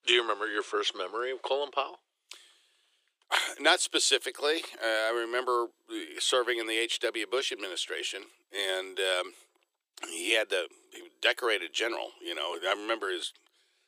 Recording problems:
thin; very; fading below 350 Hz

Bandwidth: 15 kHz